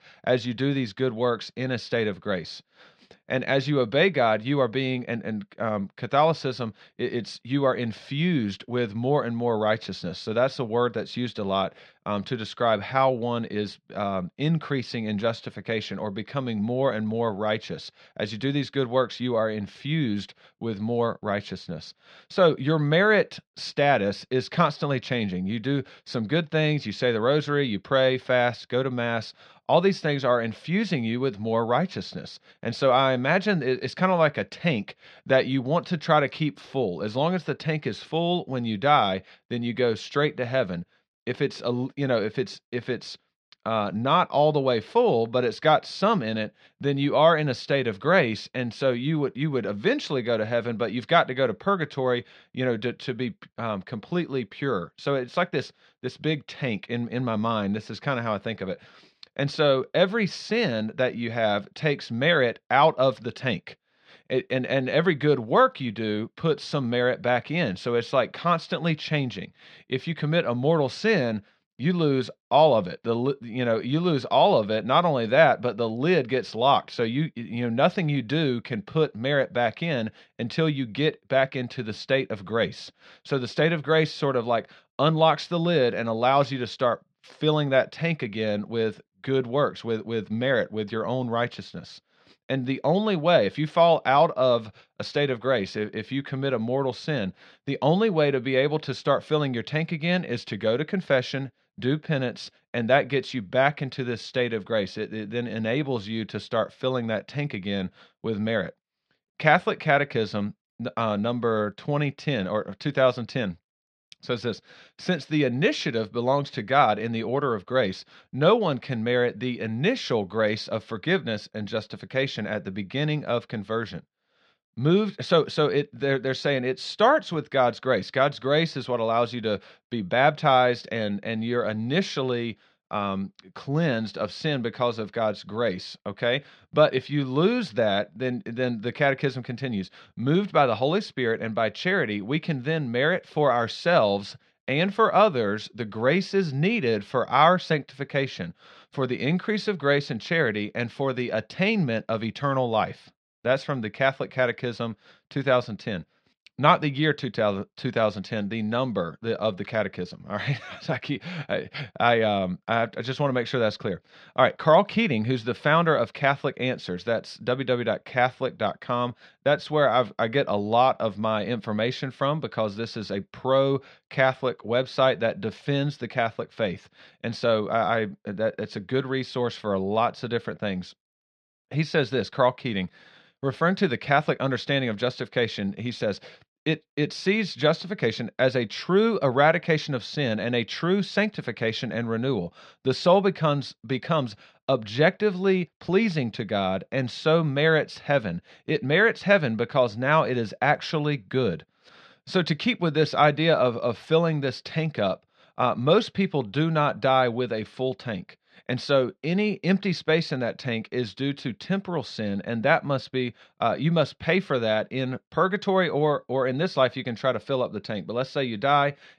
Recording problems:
muffled; very slightly; fading above 4.5 kHz

